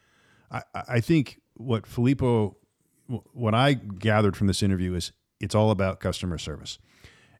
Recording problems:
none

